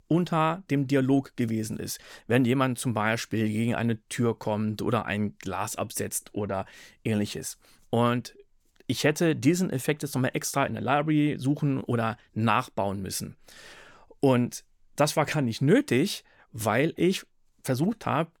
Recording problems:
none

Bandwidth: 18.5 kHz